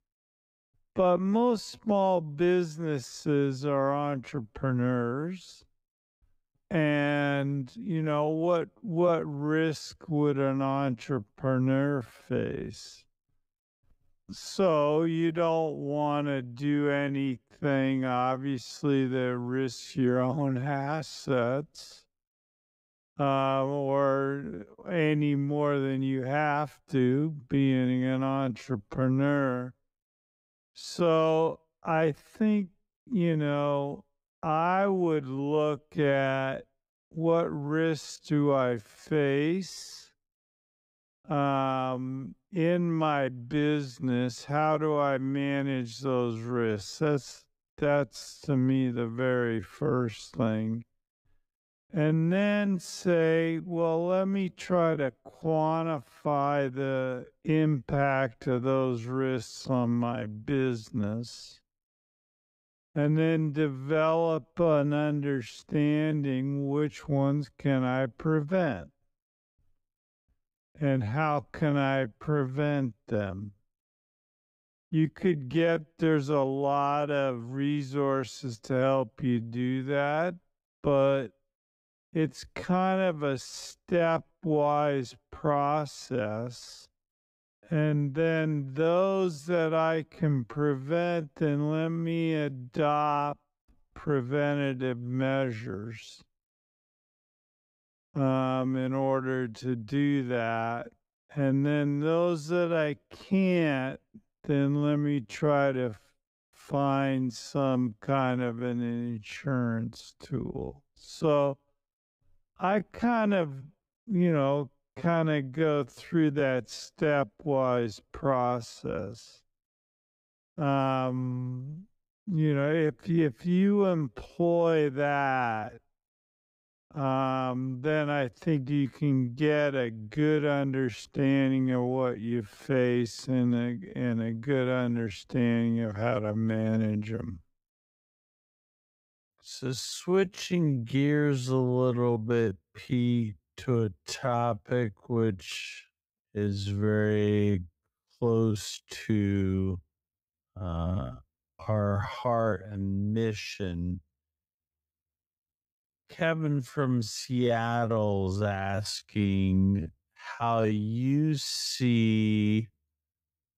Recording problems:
wrong speed, natural pitch; too slow; 0.5 times normal speed

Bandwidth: 15.5 kHz